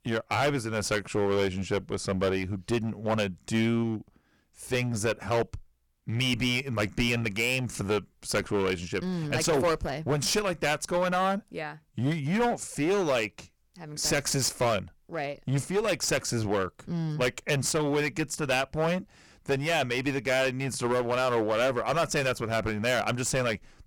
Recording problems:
distortion; heavy; 12% of the sound clipped

